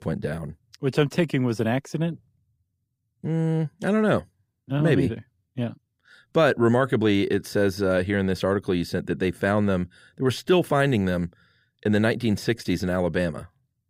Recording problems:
none

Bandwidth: 15.5 kHz